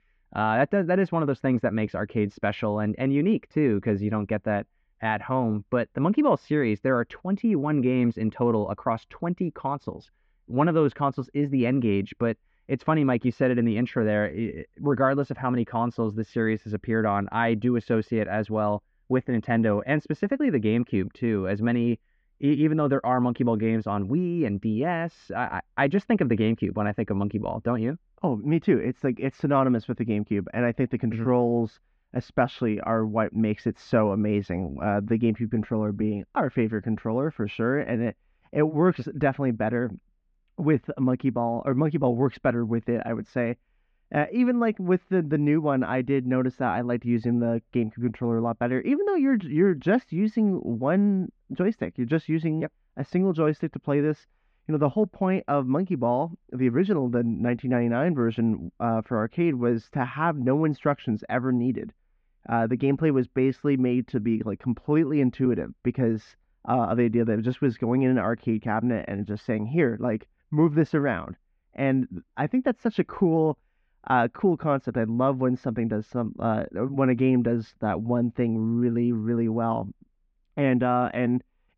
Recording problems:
muffled; very; fading above 2.5 kHz

